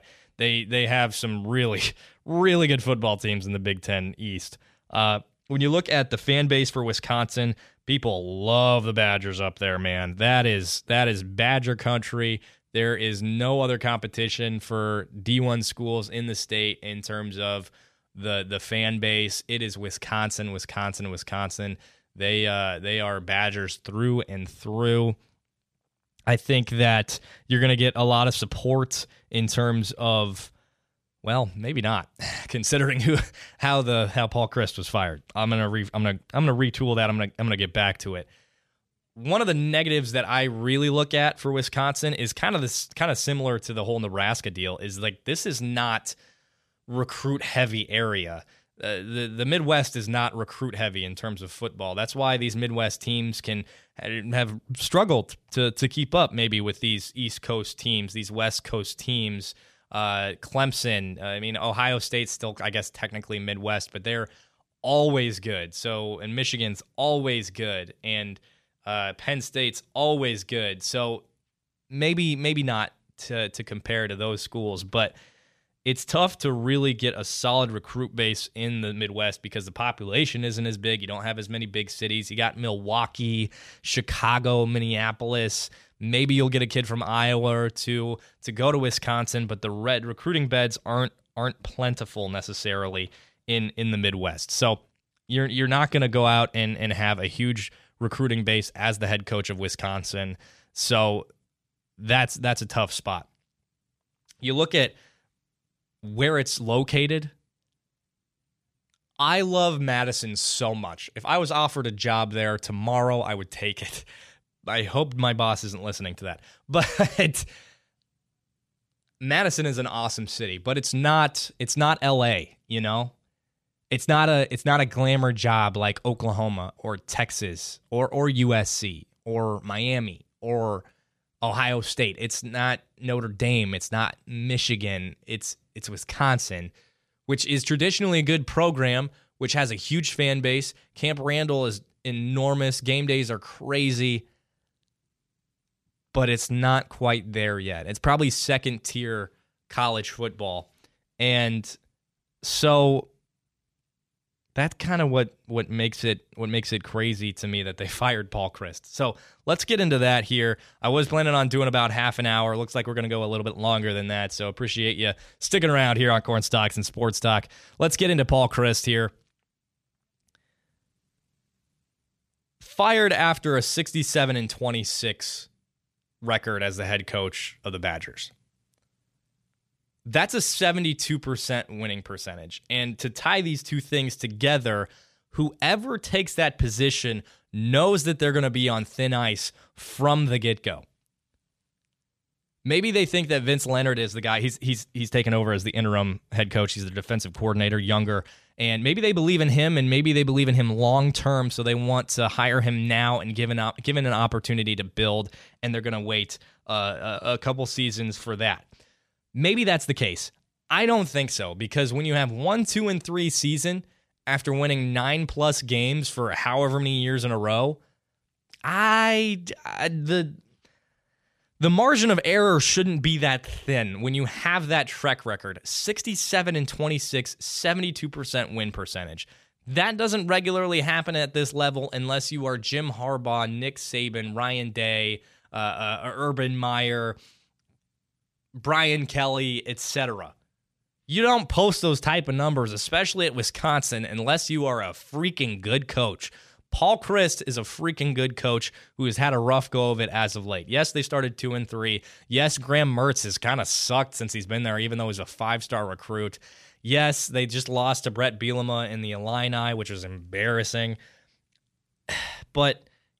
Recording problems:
none

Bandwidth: 14 kHz